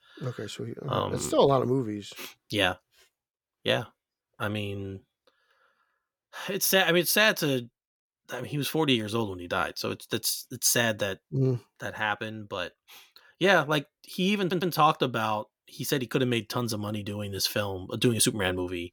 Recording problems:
audio stuttering; at 14 s

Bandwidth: 18 kHz